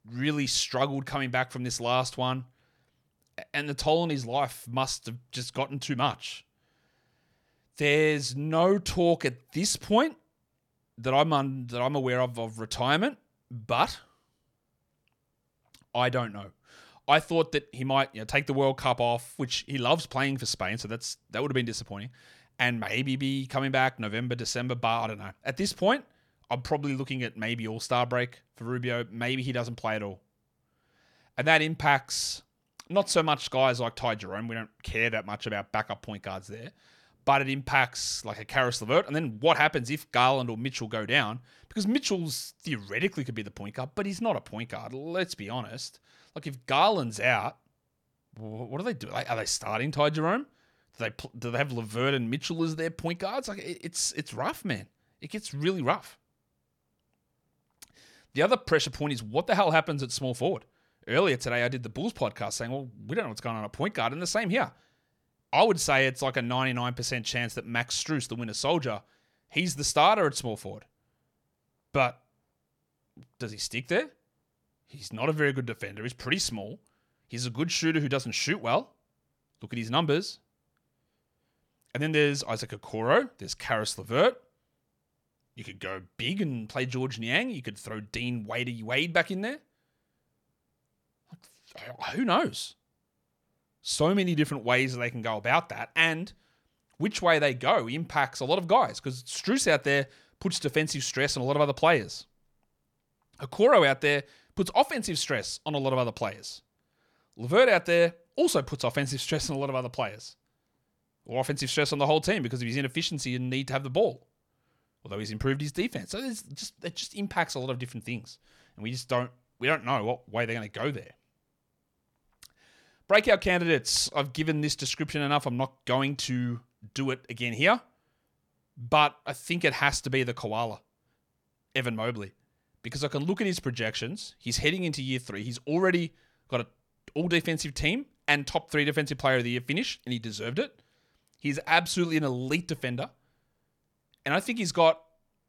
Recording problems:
none

